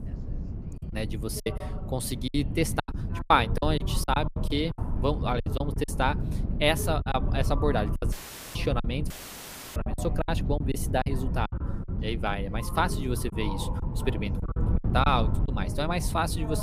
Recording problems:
background chatter; noticeable; throughout; 3 voices, 15 dB below the speech
wind noise on the microphone; occasional gusts; 15 dB below the speech
choppy; very; 10% of the speech affected
audio cutting out; filled with static; at 8 s and at 9 s for 0.5 s
abrupt cut into speech; at the end

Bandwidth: 15 kHz